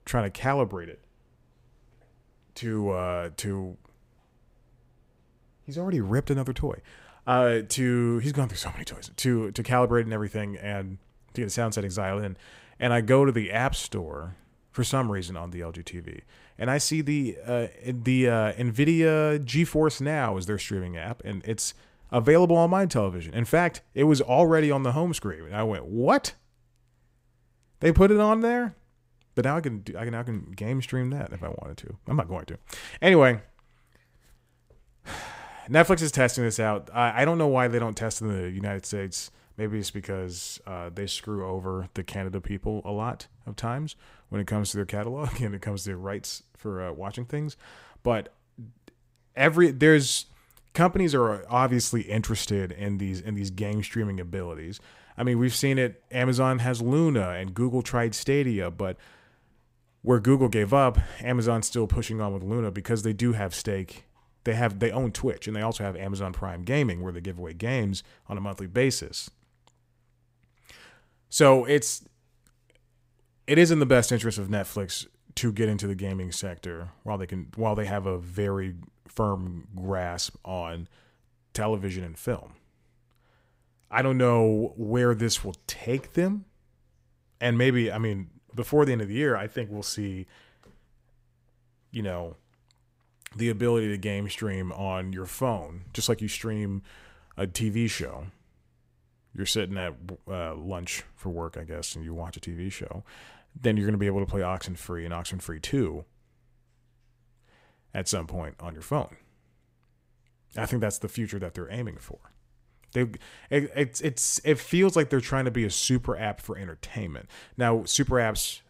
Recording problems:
none

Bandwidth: 15.5 kHz